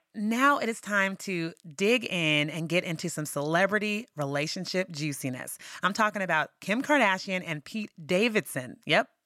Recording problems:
none

